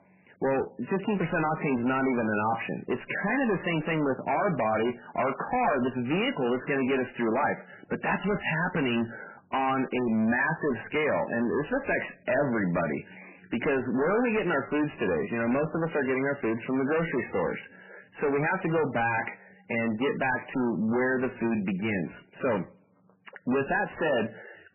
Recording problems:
distortion; heavy; 20% of the sound clipped
garbled, watery; badly; nothing above 3 kHz

